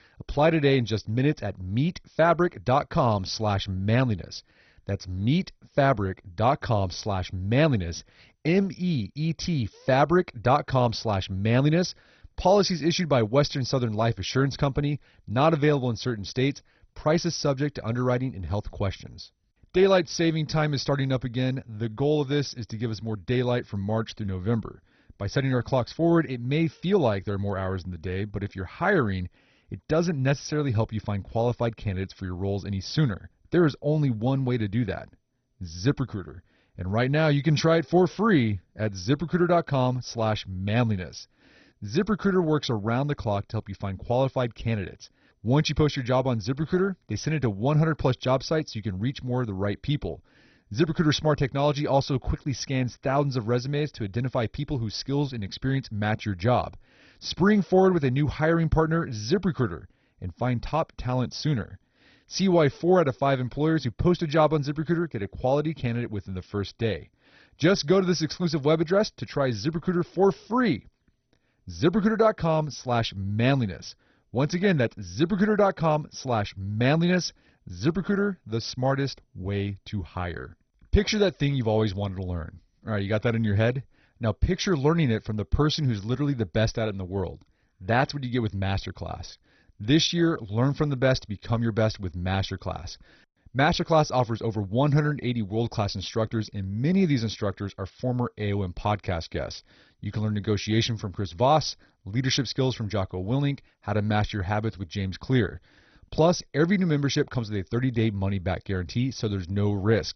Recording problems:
garbled, watery; badly; nothing above 6 kHz

